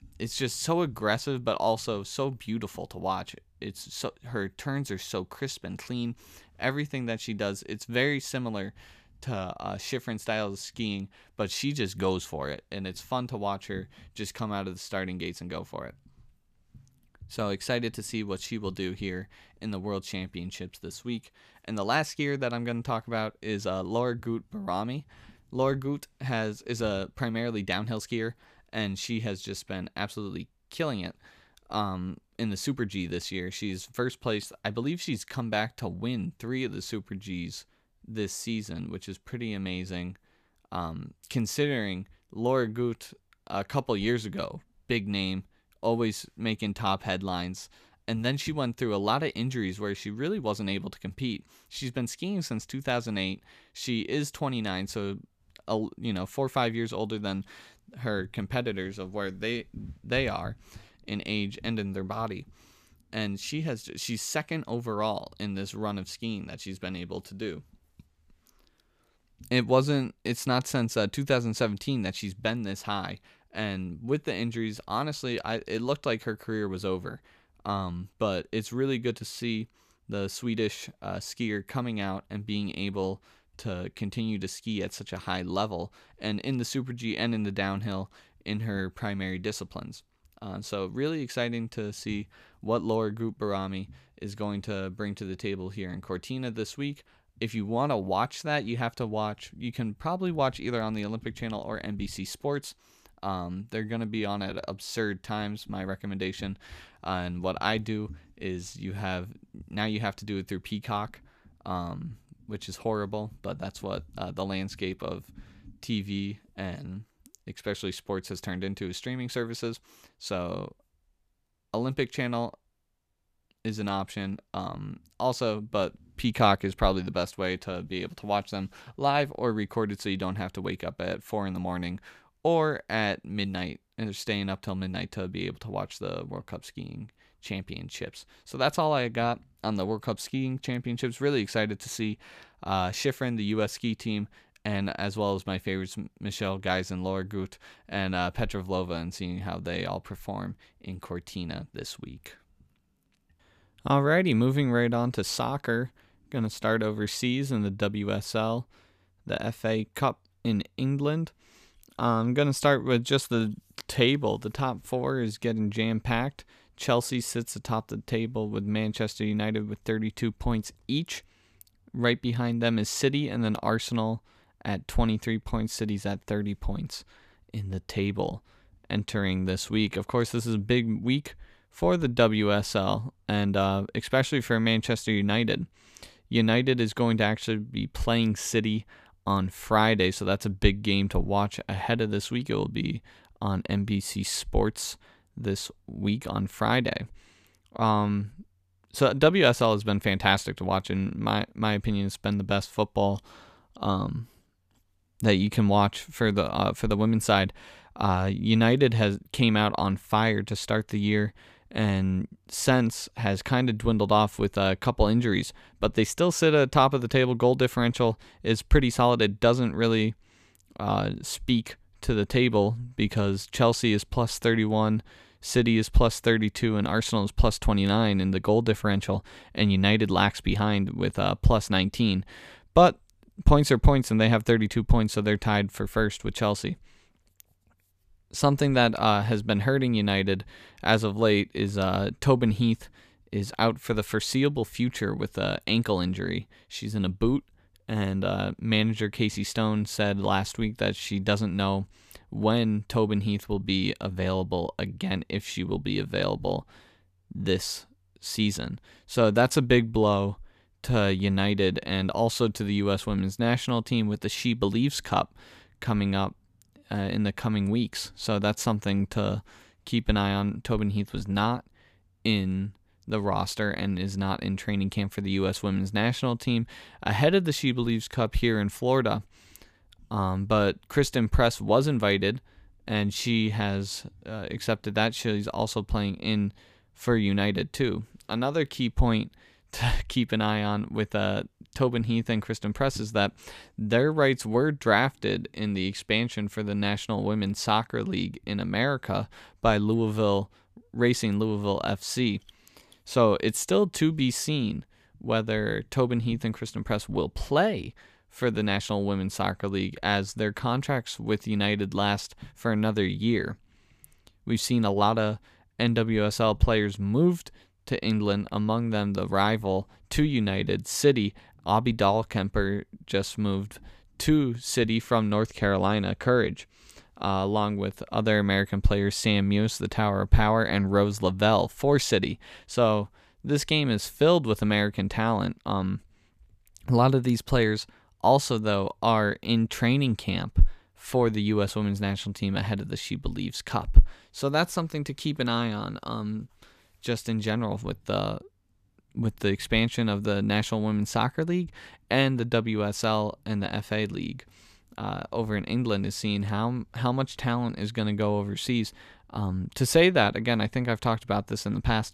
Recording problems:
none

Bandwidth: 14.5 kHz